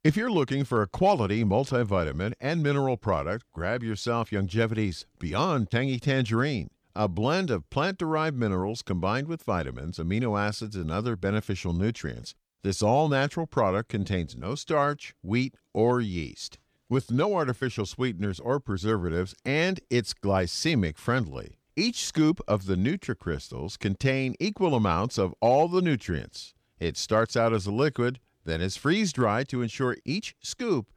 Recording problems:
none

